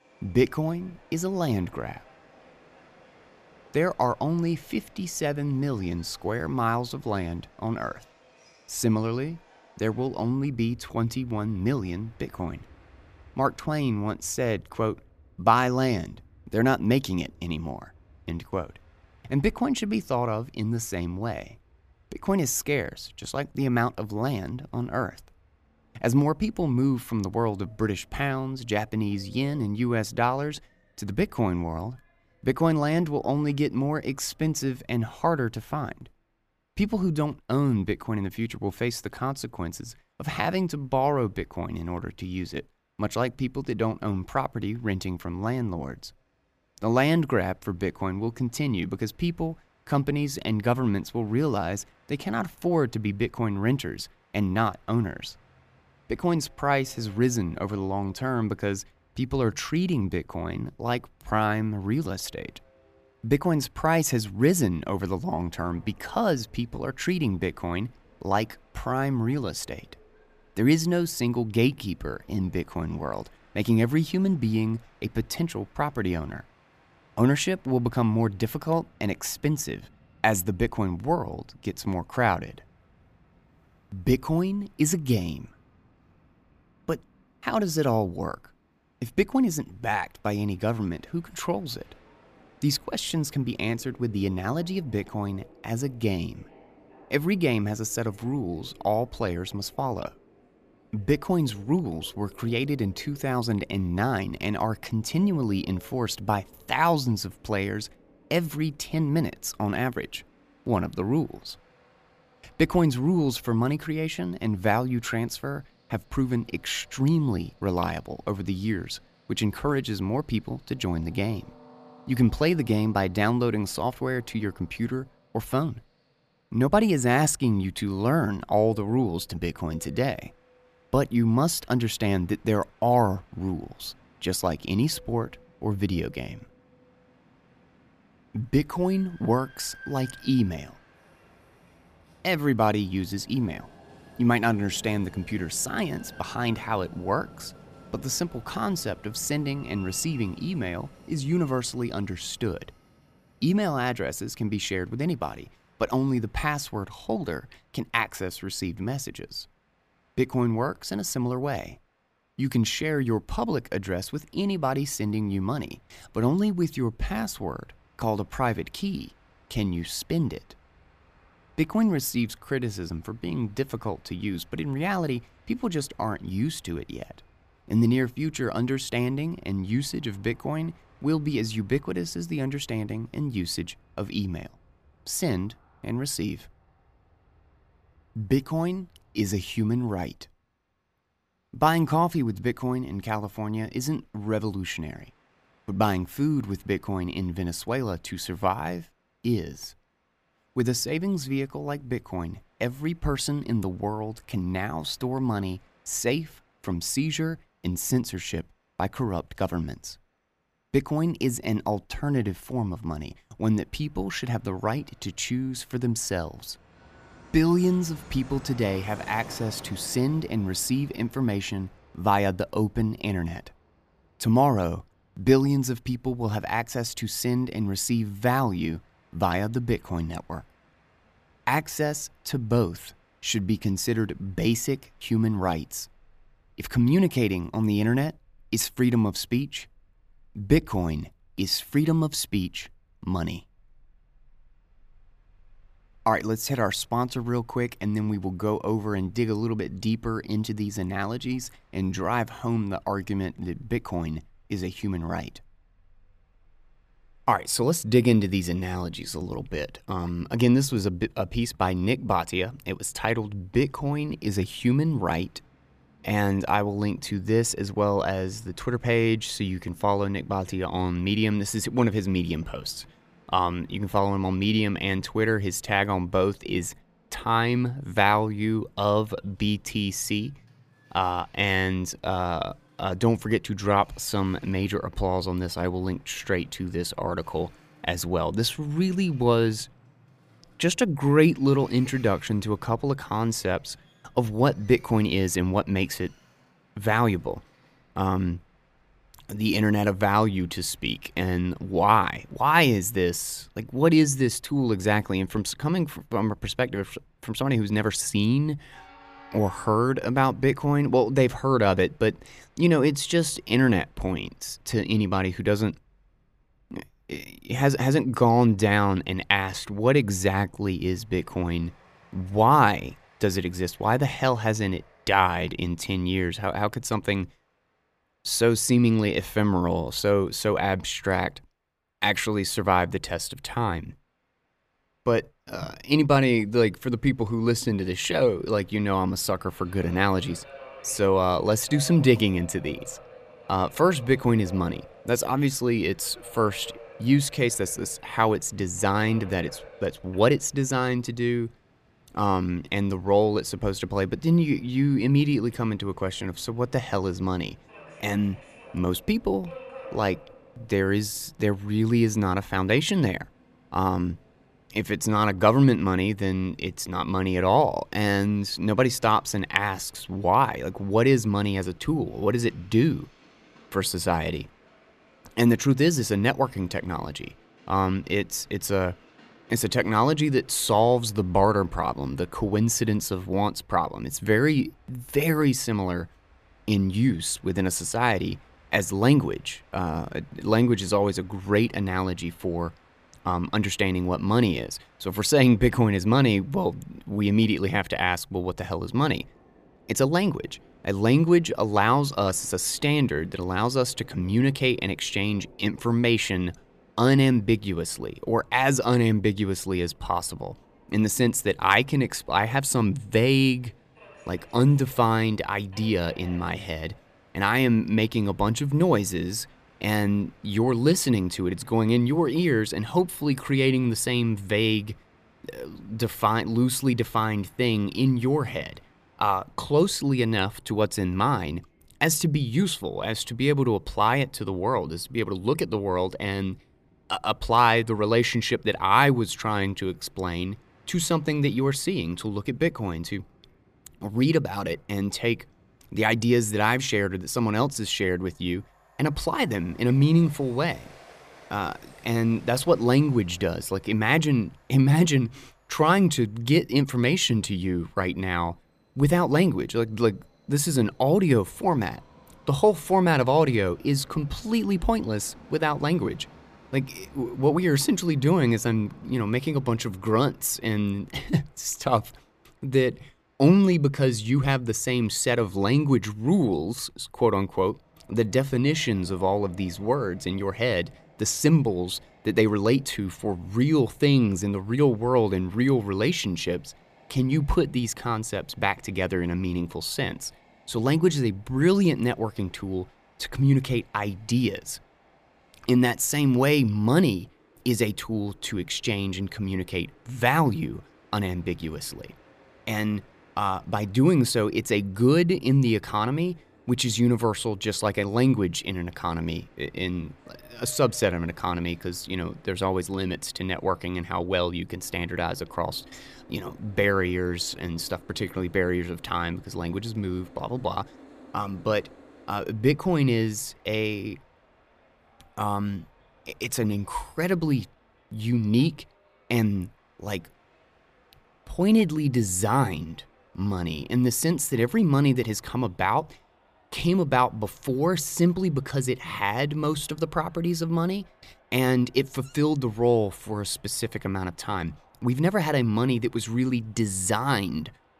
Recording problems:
train or aircraft noise; faint; throughout; 30 dB below the speech

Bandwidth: 14.5 kHz